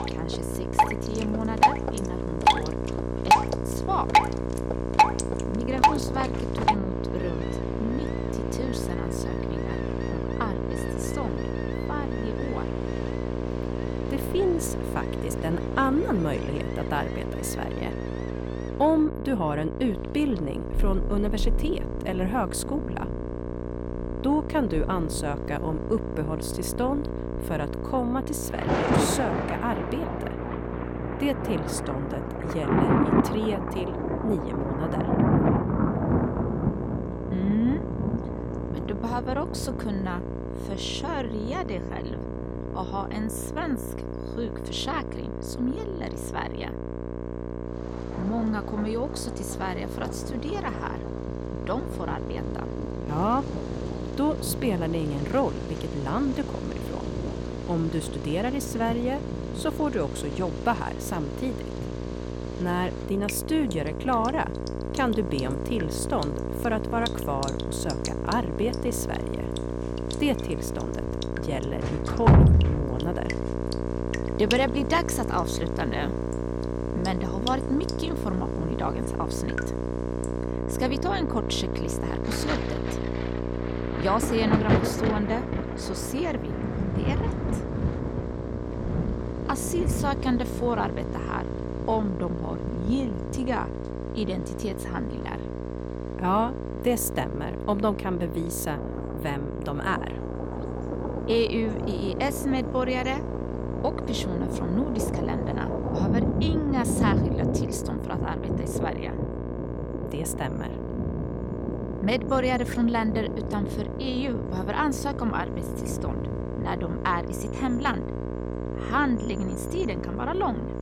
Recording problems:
distortion; slight; 10 dB below the speech
electrical hum; loud; throughout; 60 Hz, 5 dB below the speech
rain or running water; loud; throughout; as loud as the speech

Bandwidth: 17 kHz